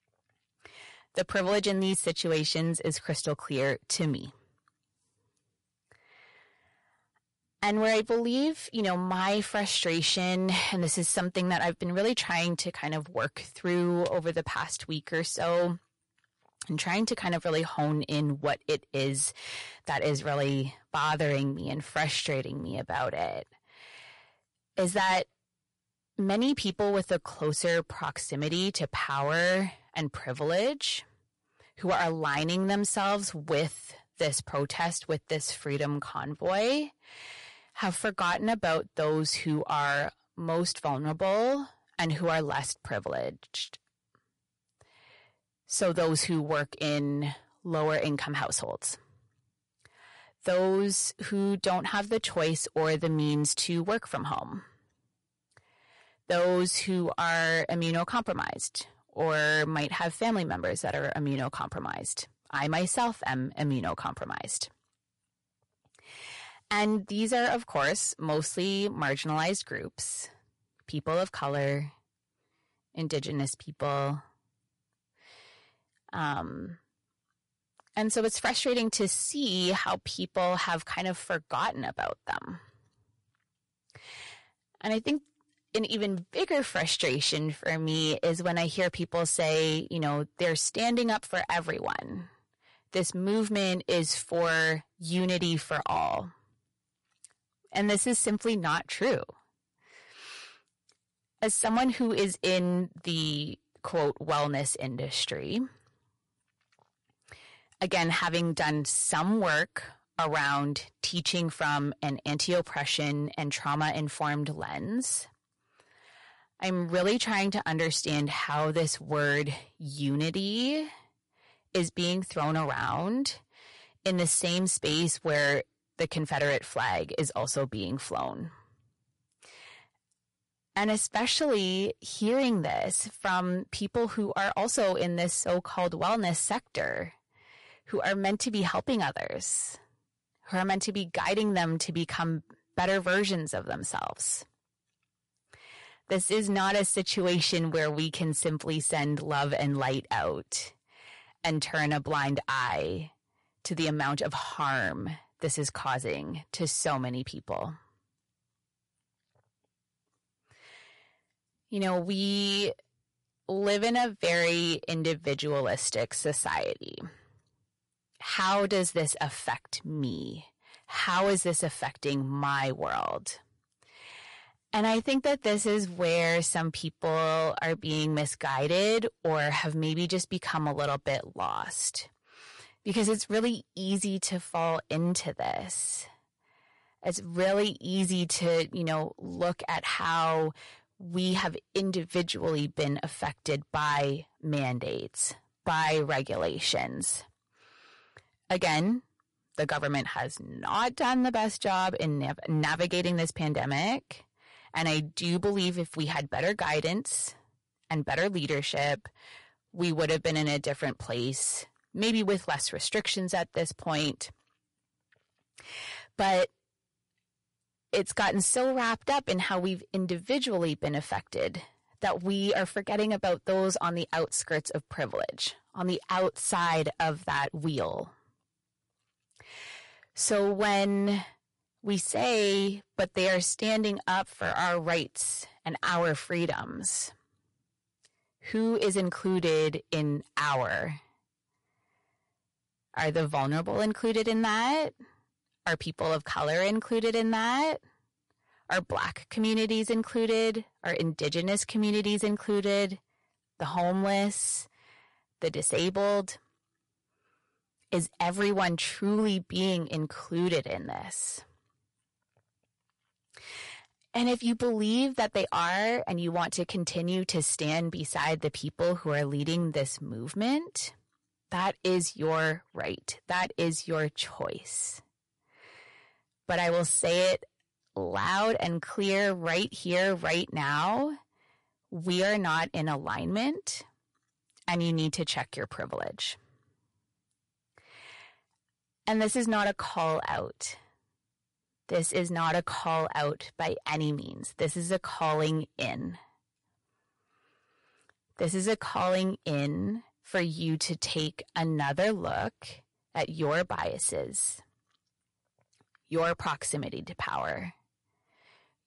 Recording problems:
distortion; slight; 5% of the sound clipped
garbled, watery; slightly; nothing above 11 kHz

